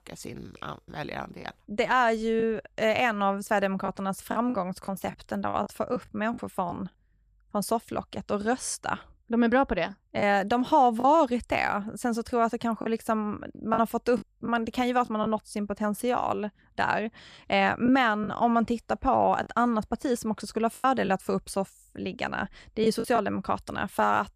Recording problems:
choppy; occasionally; 4% of the speech affected

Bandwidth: 14.5 kHz